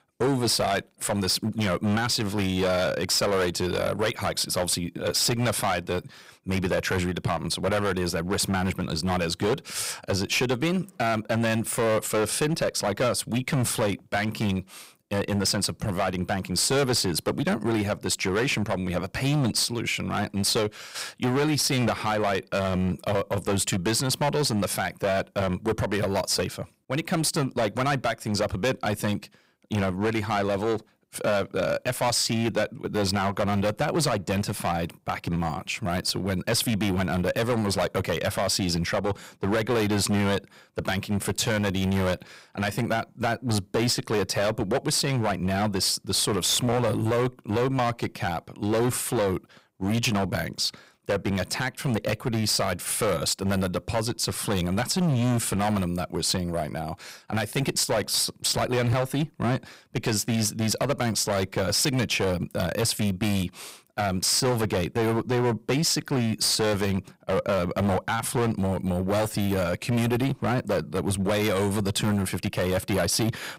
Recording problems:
distortion; heavy; 14% of the sound clipped

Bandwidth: 15.5 kHz